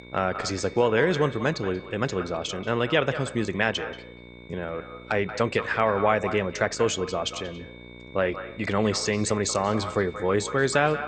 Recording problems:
echo of what is said; noticeable; throughout; 180 ms later, 10 dB below the speech
garbled, watery; slightly; nothing above 8.5 kHz
electrical hum; faint; throughout; 60 Hz, 25 dB below the speech
high-pitched whine; faint; throughout; 2 kHz, 20 dB below the speech
uneven, jittery; strongly; from 0.5 to 10 s

